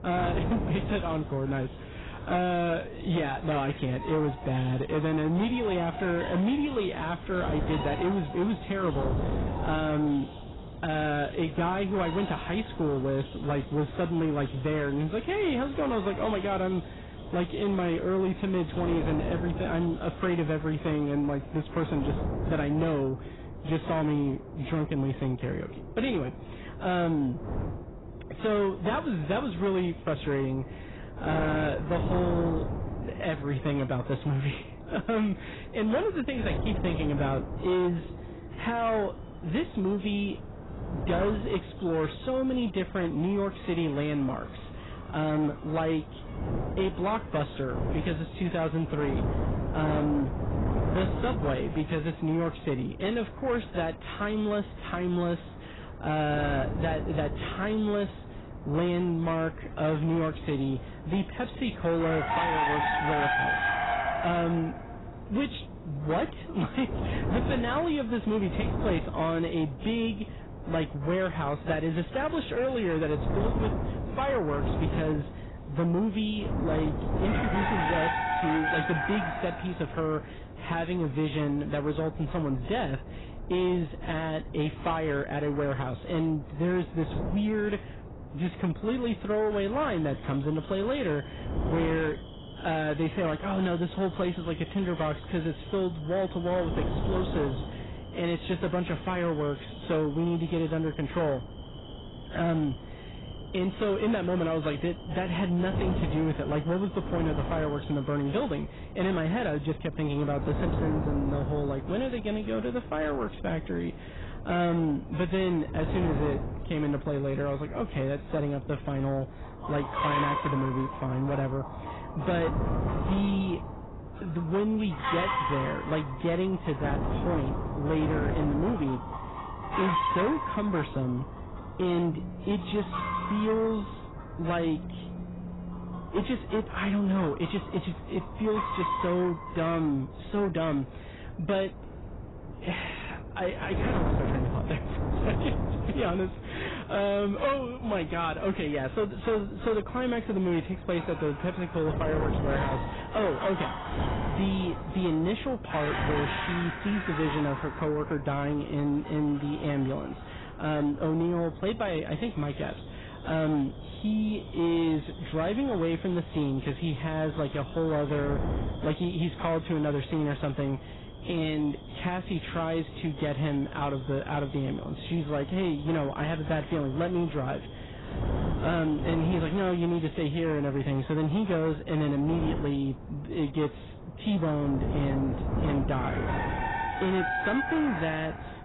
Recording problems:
garbled, watery; badly; nothing above 4 kHz
distortion; slight; 10 dB below the speech
animal sounds; loud; throughout; 6 dB below the speech
wind noise on the microphone; occasional gusts; 10 dB below the speech
phone ringing; faint; from 2:12 to 2:16; peak 10 dB below the speech

